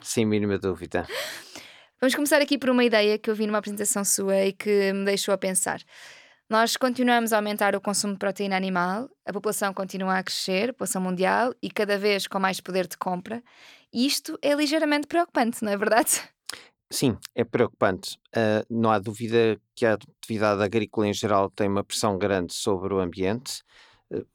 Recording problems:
none

